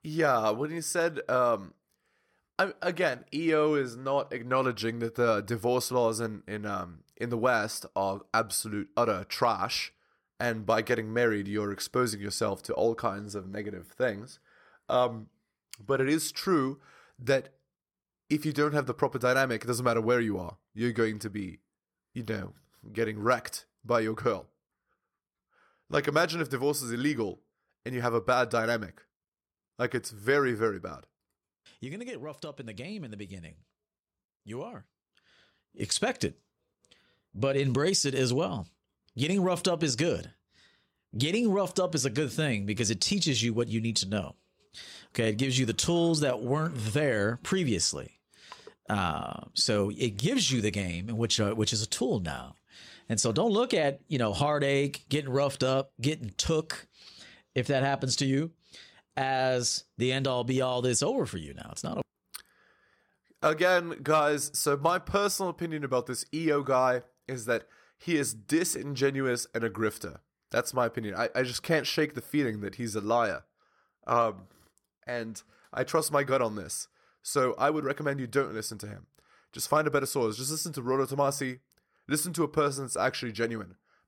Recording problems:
none

